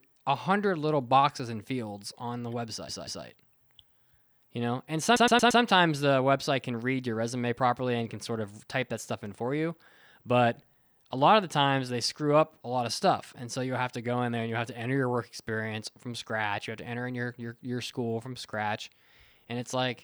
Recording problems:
audio stuttering; at 2.5 s and at 5 s

